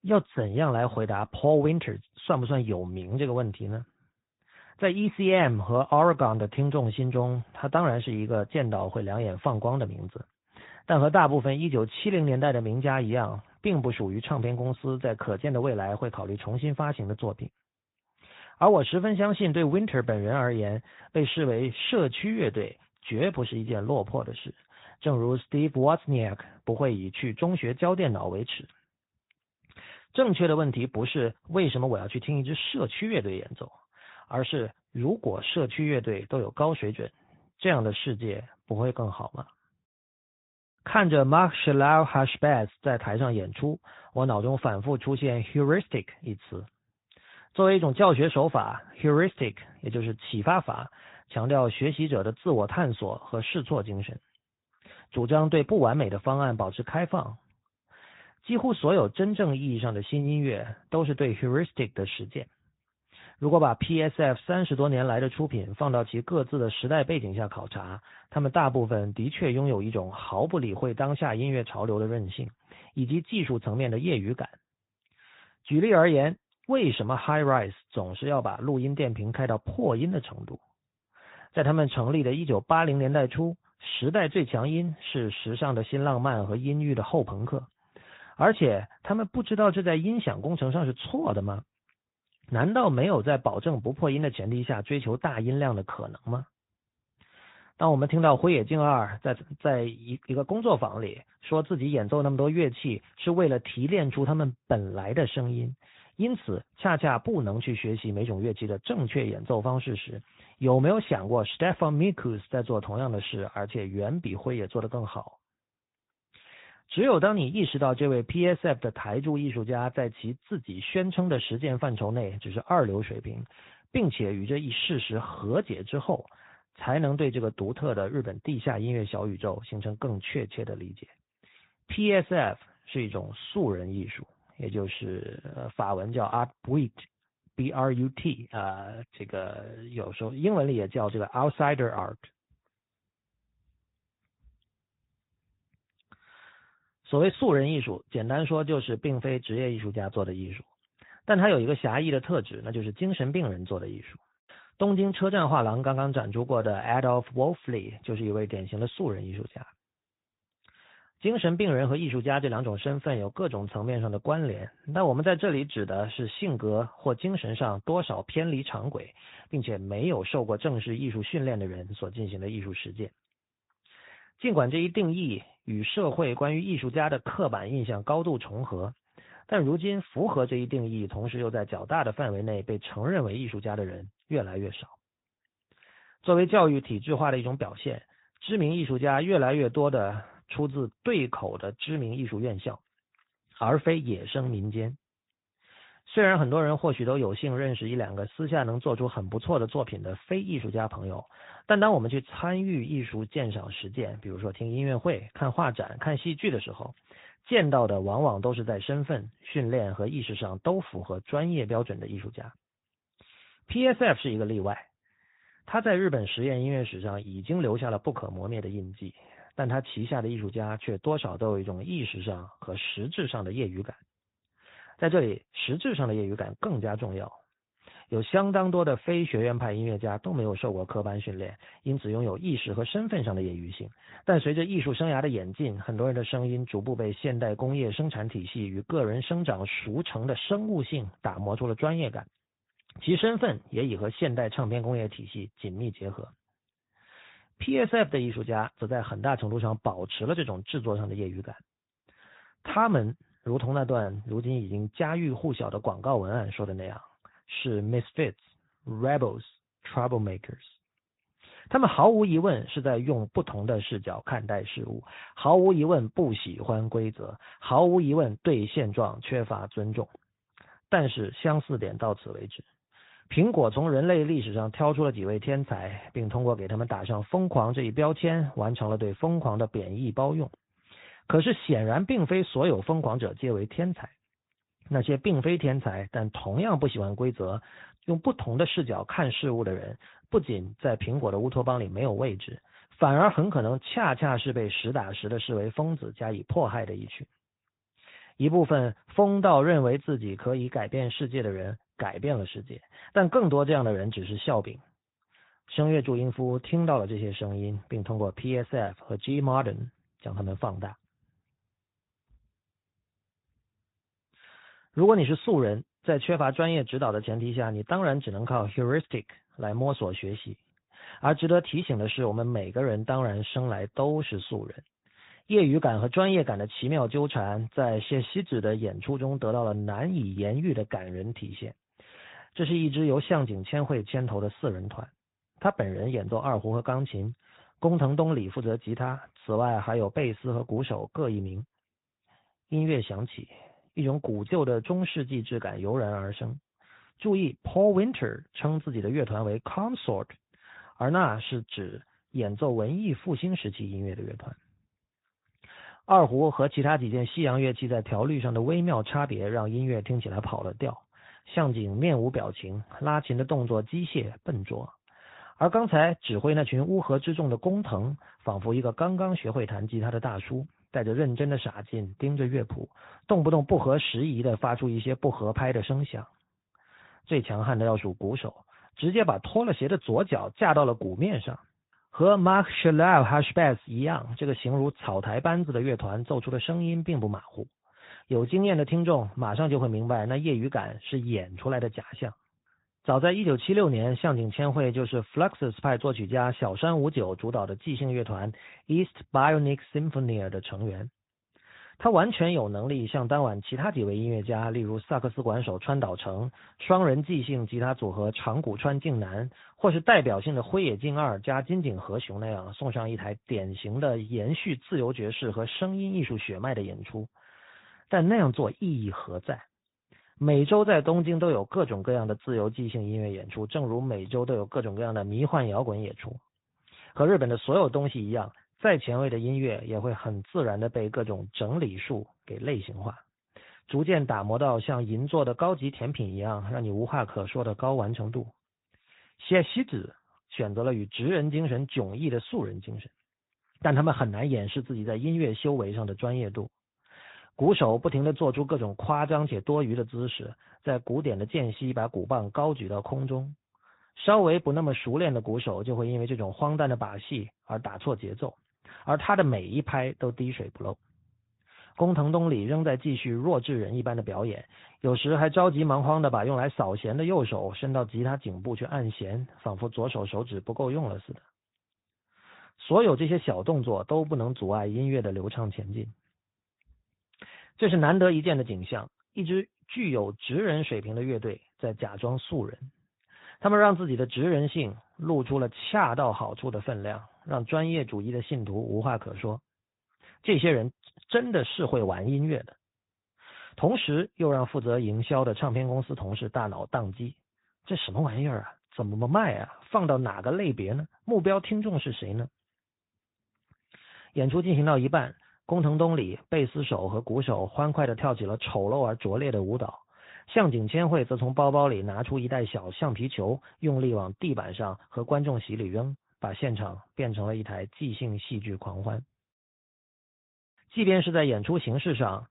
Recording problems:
high frequencies cut off; severe; nothing above 4 kHz
garbled, watery; slightly

